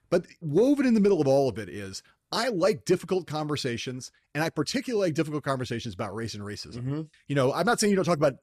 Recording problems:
none

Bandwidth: 14 kHz